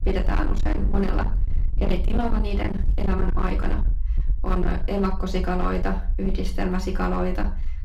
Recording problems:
off-mic speech; far
room echo; slight; dies away in 0.3 s
distortion; slight; 21% of the sound clipped
low rumble; noticeable; throughout; 10 dB below the speech

